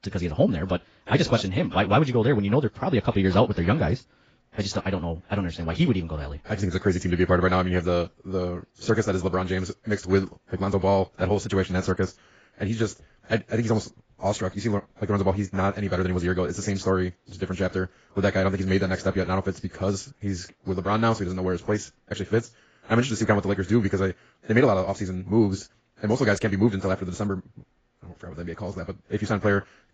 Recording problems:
garbled, watery; badly; nothing above 7.5 kHz
wrong speed, natural pitch; too fast; 1.6 times normal speed

